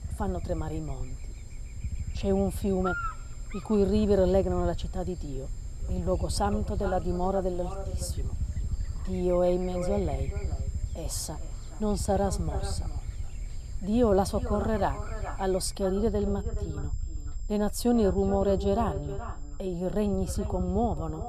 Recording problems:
echo of what is said; noticeable; from 6 s on; 420 ms later, 15 dB below the speech
electrical hum; noticeable; until 16 s; 60 Hz, 15 dB below the speech
high-pitched whine; faint; throughout; 7.5 kHz, 25 dB below the speech
low rumble; faint; throughout; 25 dB below the speech

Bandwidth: 13.5 kHz